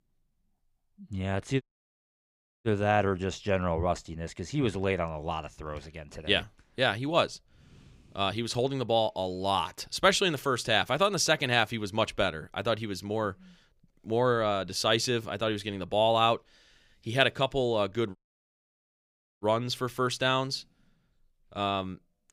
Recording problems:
audio cutting out; at 1.5 s for 1 s and at 18 s for 1.5 s

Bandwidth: 15.5 kHz